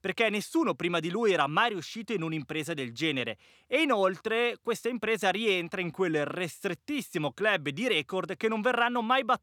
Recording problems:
none

